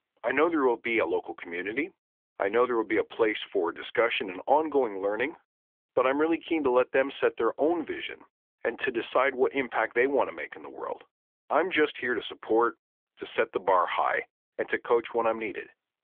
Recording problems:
phone-call audio; nothing above 3.5 kHz

